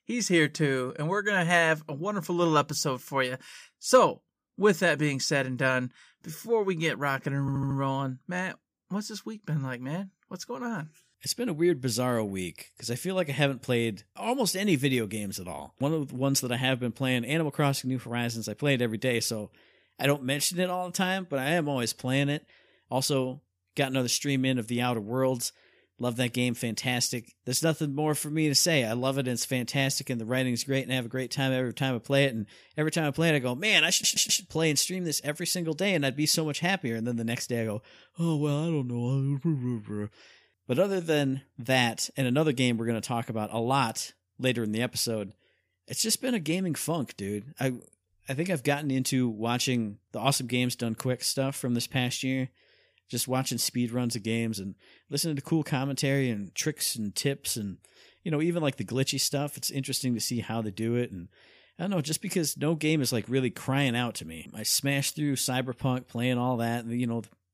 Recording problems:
audio stuttering; at 7.5 s and at 34 s

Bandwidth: 15 kHz